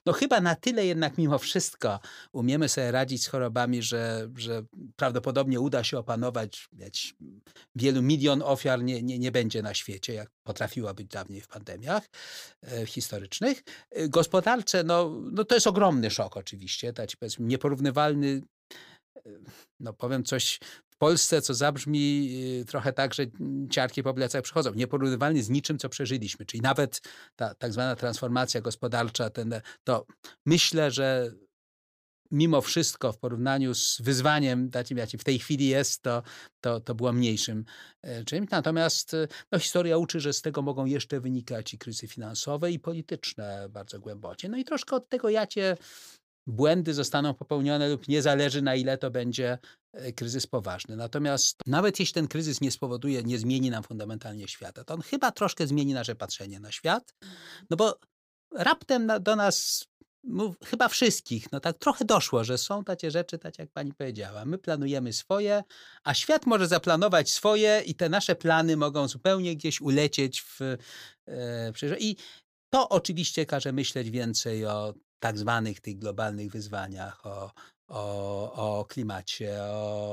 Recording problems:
abrupt cut into speech; at the end

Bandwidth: 15 kHz